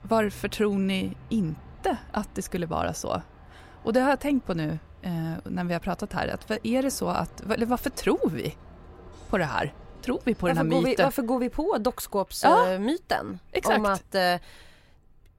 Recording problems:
traffic noise; faint; throughout; 25 dB below the speech

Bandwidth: 16 kHz